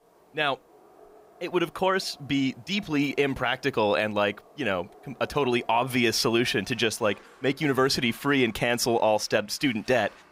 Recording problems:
animal sounds; faint; throughout; 25 dB below the speech

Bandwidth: 15.5 kHz